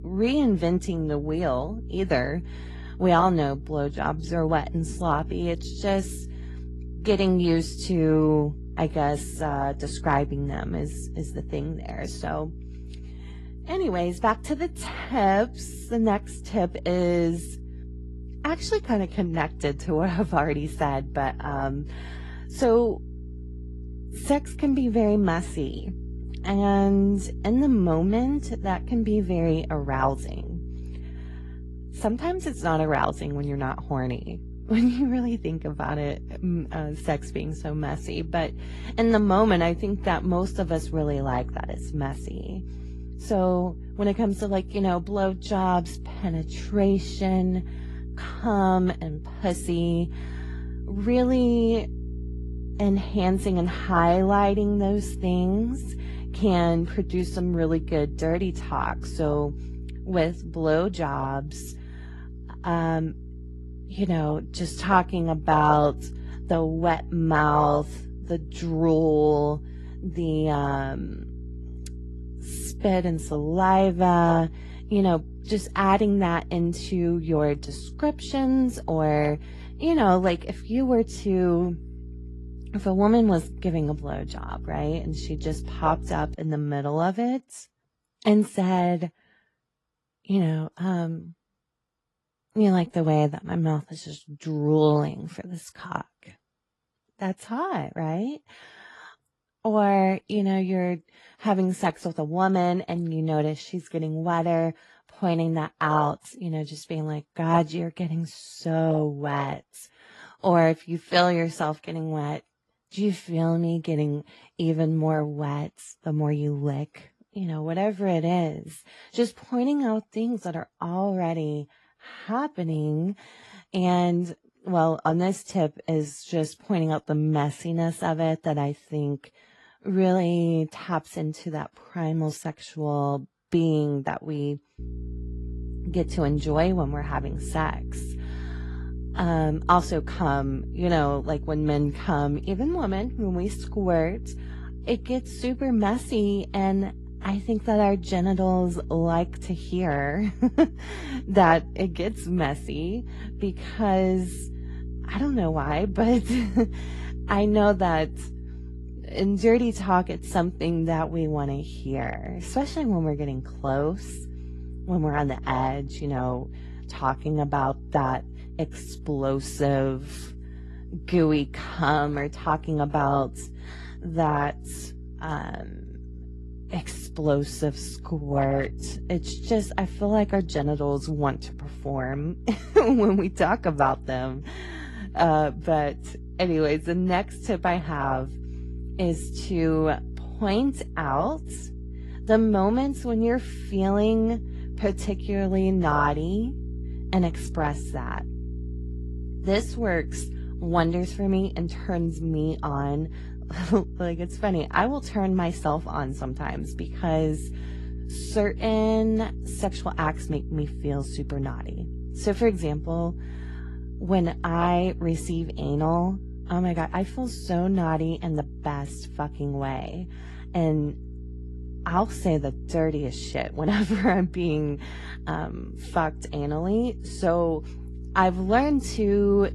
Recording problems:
garbled, watery; slightly; nothing above 11.5 kHz
electrical hum; faint; until 1:26 and from 2:15 on; 60 Hz, 25 dB below the speech

